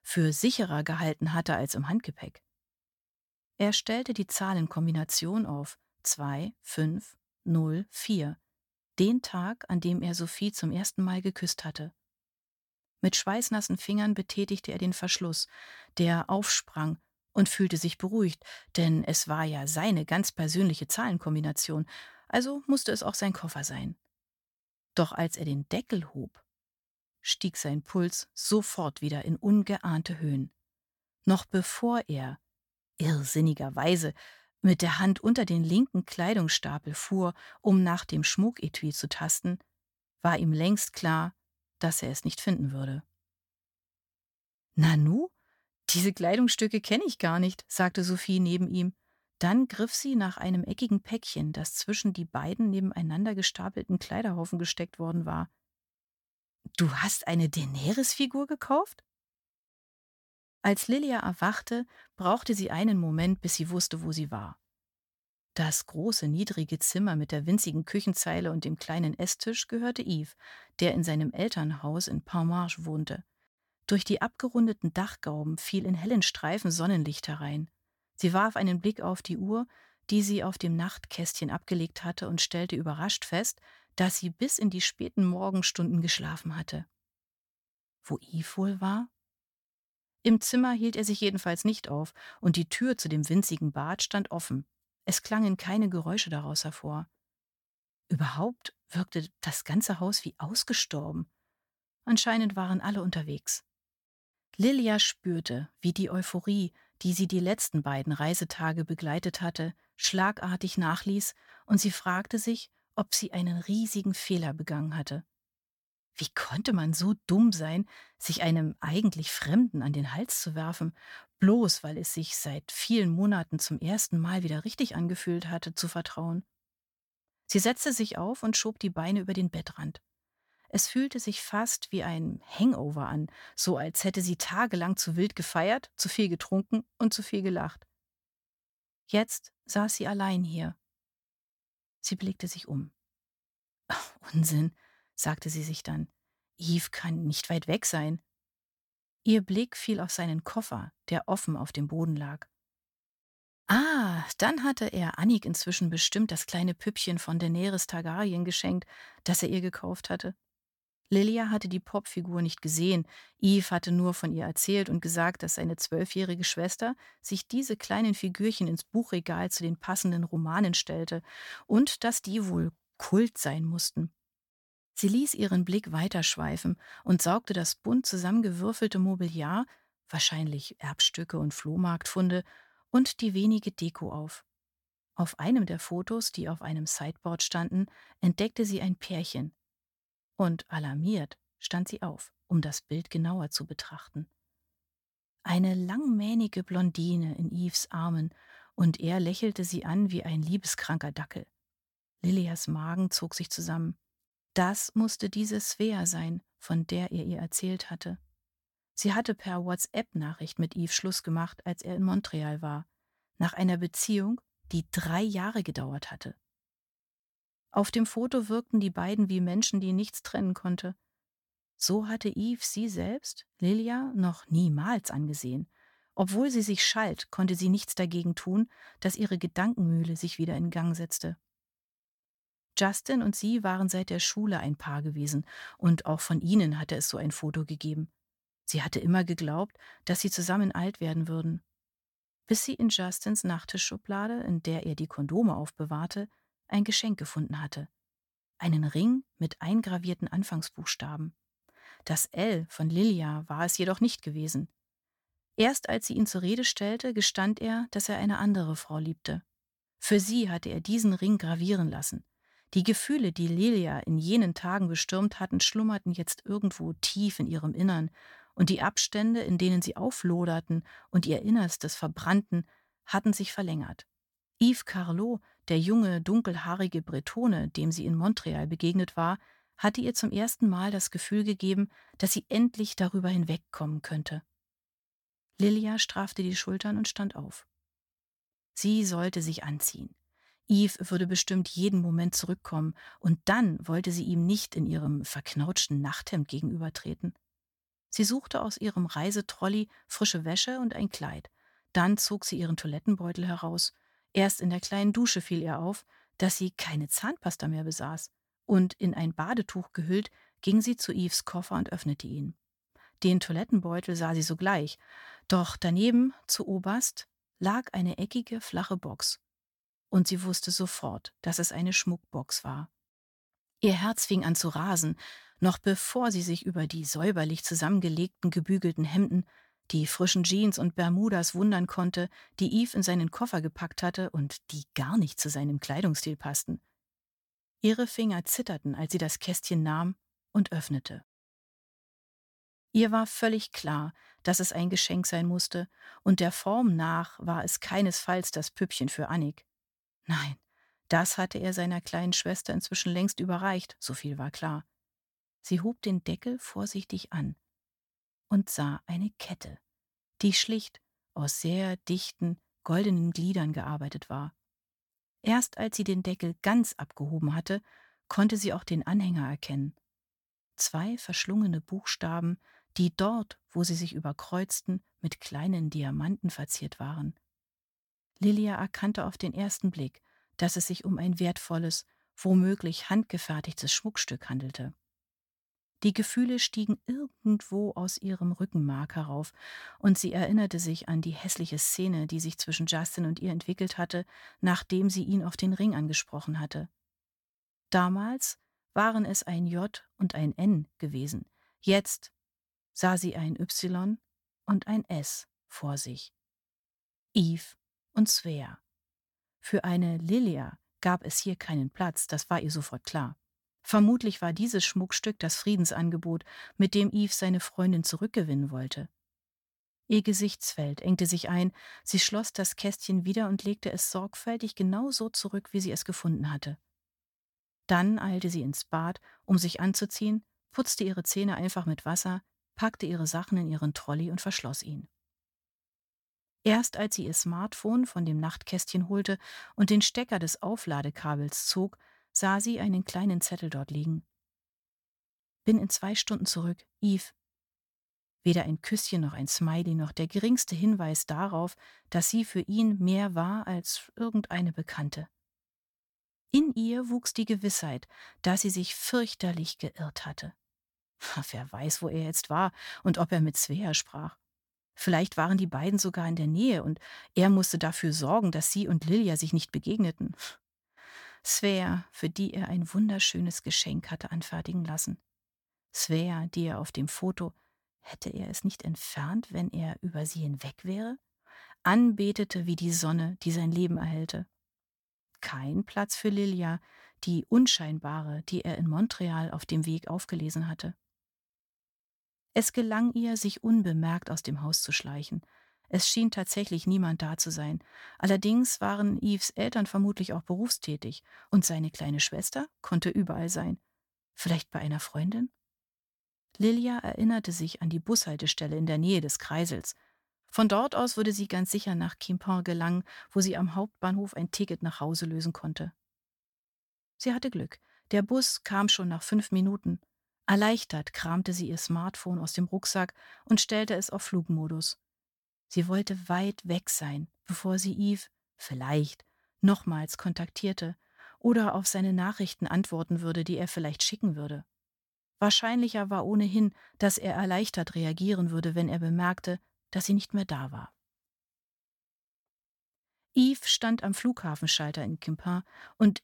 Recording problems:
none

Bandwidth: 17.5 kHz